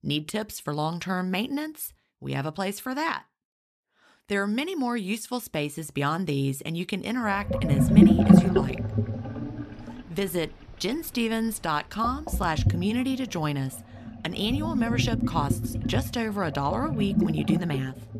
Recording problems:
household noises; very loud; from 7.5 s on; 5 dB above the speech

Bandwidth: 14 kHz